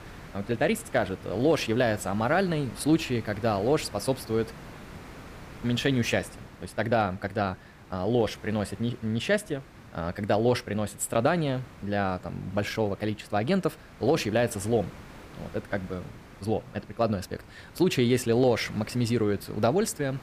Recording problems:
hiss; noticeable; throughout; 20 dB below the speech

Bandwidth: 15 kHz